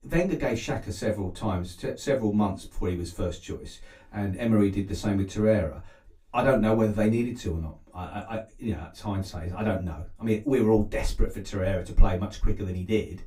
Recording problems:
off-mic speech; far
room echo; very slight; dies away in 0.2 s

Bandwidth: 15.5 kHz